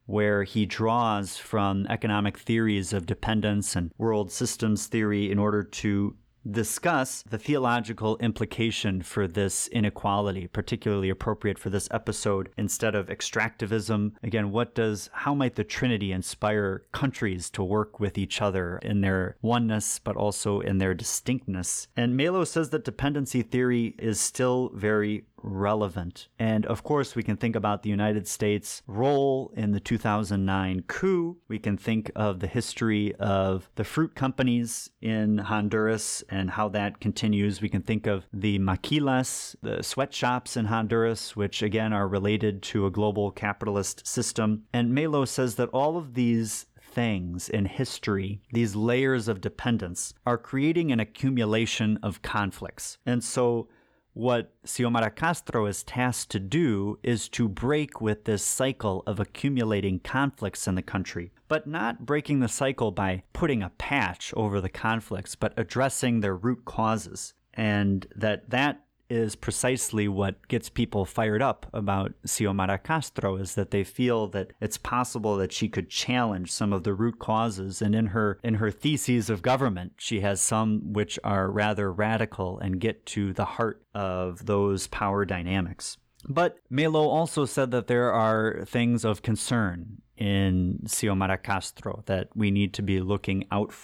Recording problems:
none

